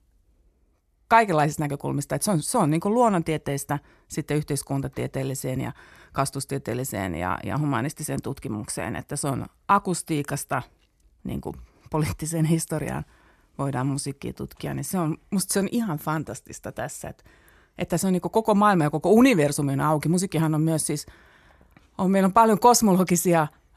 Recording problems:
none

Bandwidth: 14 kHz